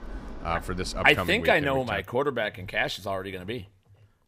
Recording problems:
train or aircraft noise; noticeable; at the start; 15 dB below the speech

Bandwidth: 15.5 kHz